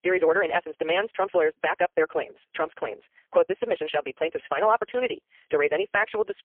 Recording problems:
phone-call audio; poor line; nothing above 3 kHz
wrong speed, natural pitch; too fast; 1.5 times normal speed

